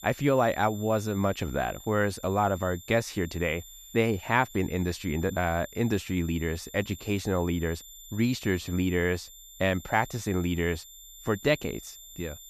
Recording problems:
high-pitched whine; noticeable; throughout; 7 kHz, 15 dB below the speech

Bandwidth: 14.5 kHz